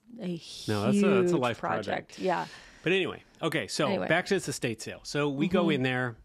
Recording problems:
none

